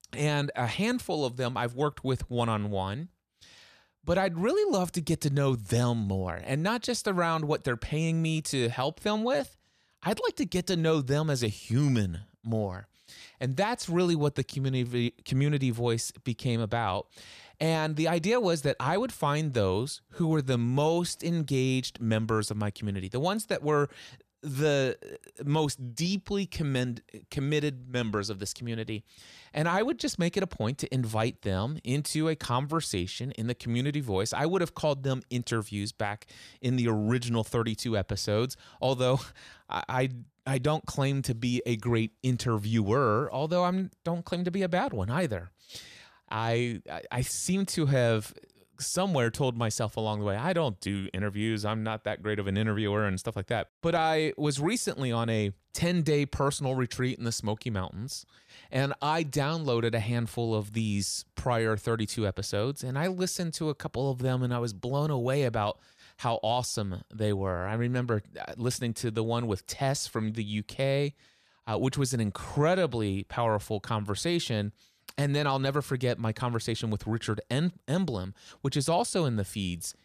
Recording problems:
none

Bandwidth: 14.5 kHz